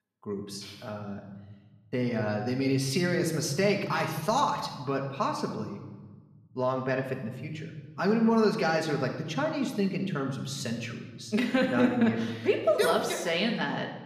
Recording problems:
room echo; slight; dies away in 1.2 s
off-mic speech; somewhat distant

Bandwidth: 14.5 kHz